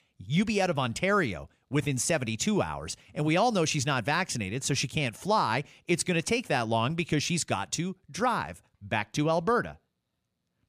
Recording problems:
none

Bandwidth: 14.5 kHz